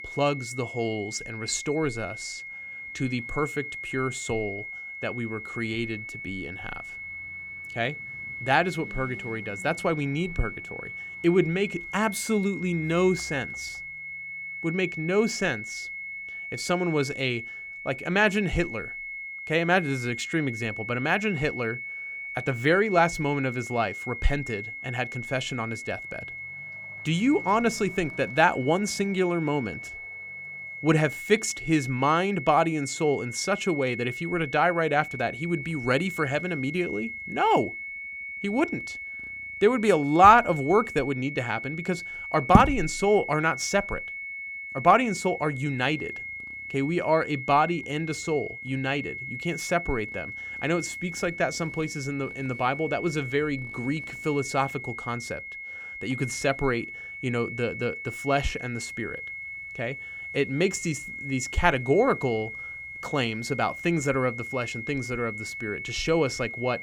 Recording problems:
high-pitched whine; loud; throughout; 2 kHz, 9 dB below the speech
traffic noise; faint; throughout; 30 dB below the speech

